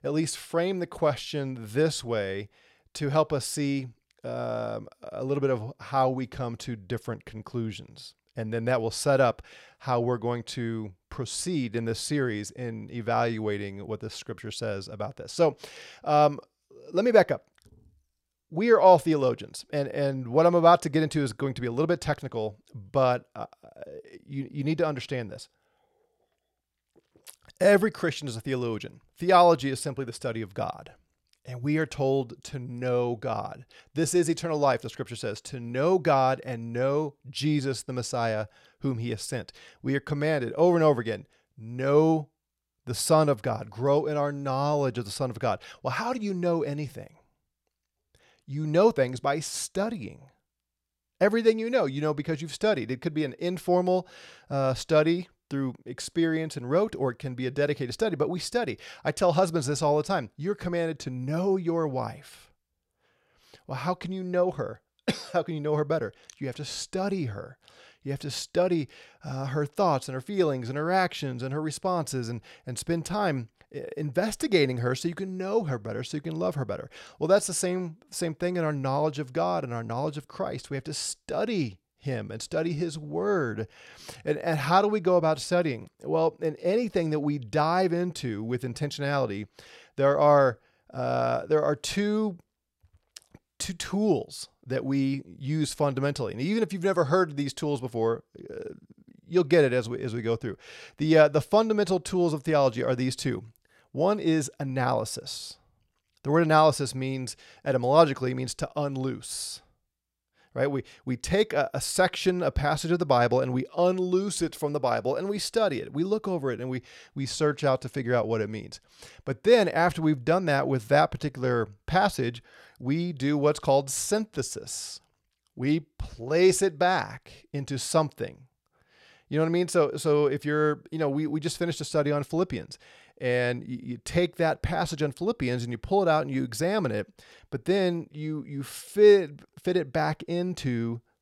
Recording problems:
none

